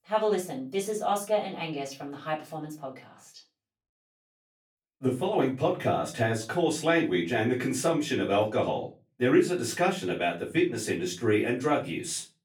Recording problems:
off-mic speech; far
room echo; very slight; dies away in 0.3 s

